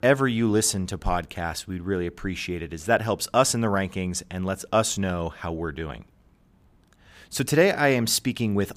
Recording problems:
none

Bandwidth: 15 kHz